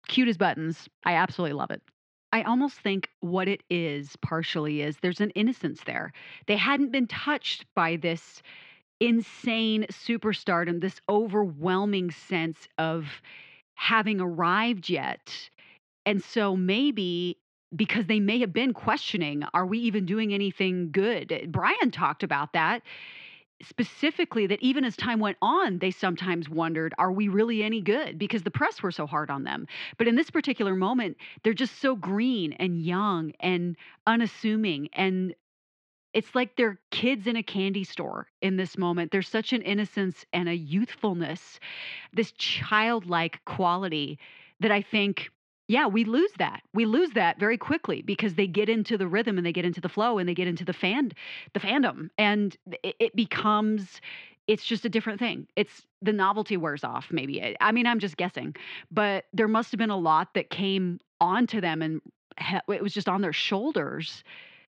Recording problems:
muffled; slightly; fading above 3.5 kHz

